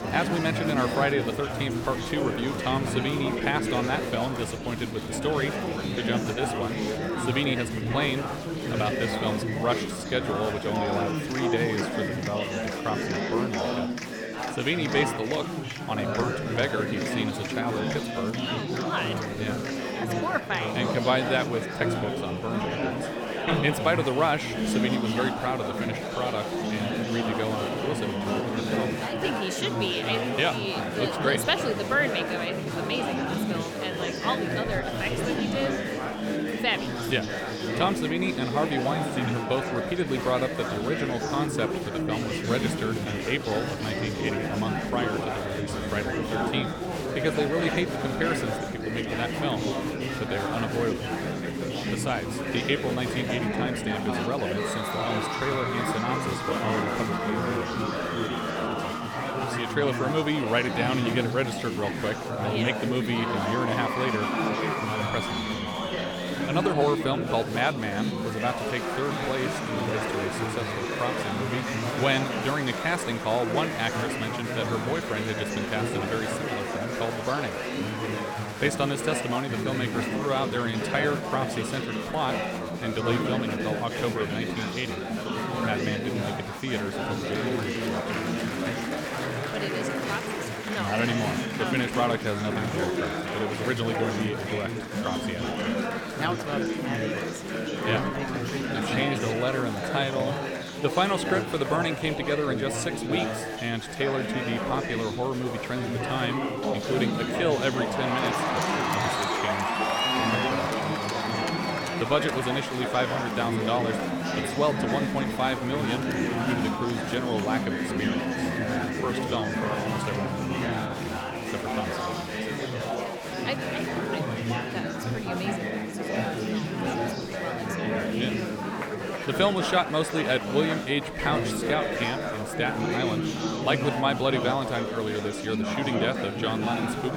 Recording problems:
chatter from many people; very loud; throughout; as loud as the speech

